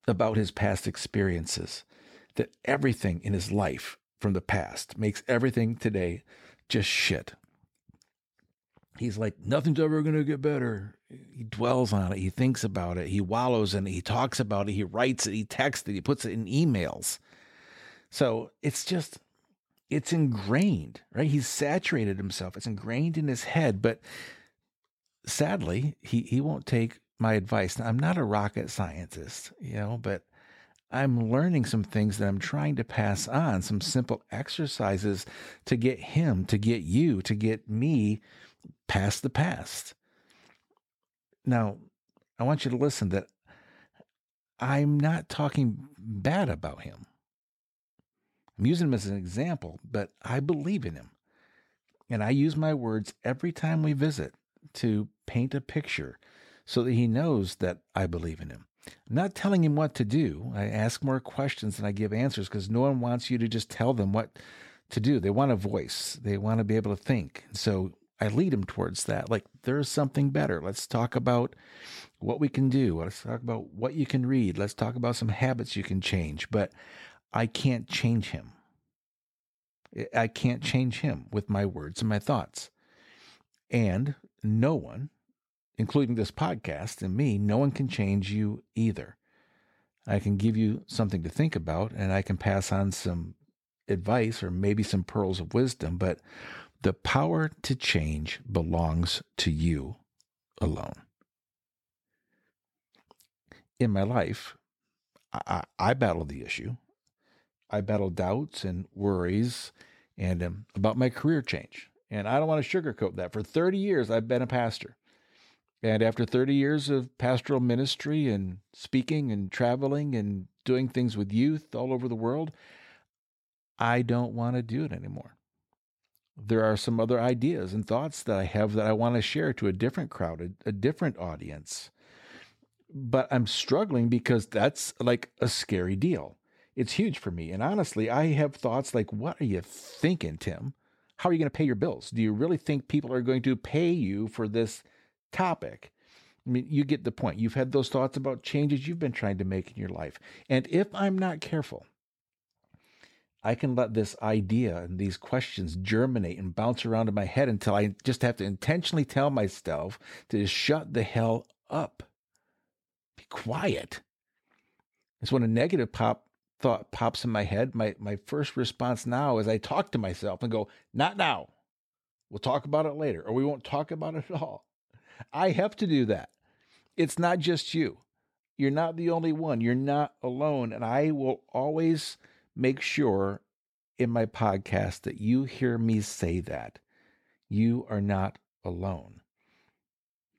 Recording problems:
uneven, jittery; strongly; from 9.5 s to 2:47

